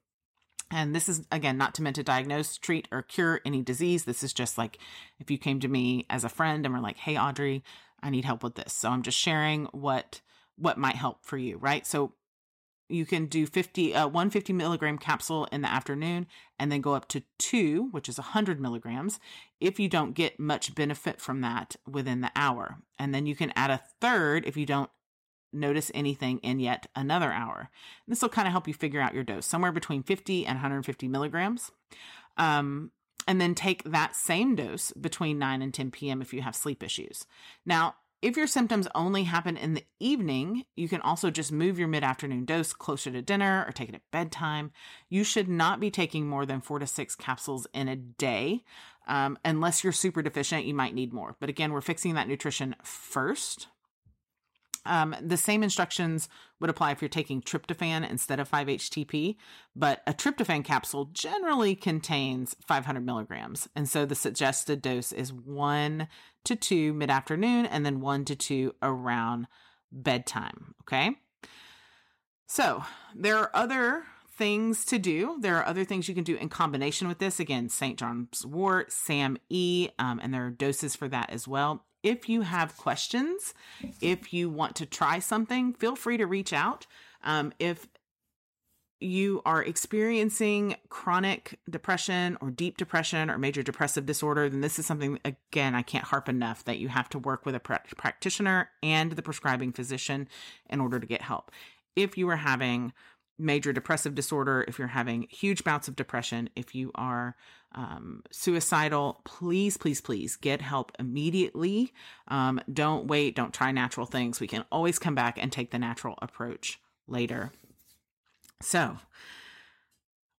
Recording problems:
none

